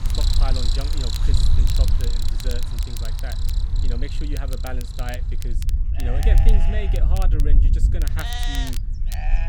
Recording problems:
animal sounds; very loud; throughout; 1 dB above the speech
low rumble; loud; throughout; 6 dB below the speech
crackle, like an old record; loud; 6 dB below the speech

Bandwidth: 17 kHz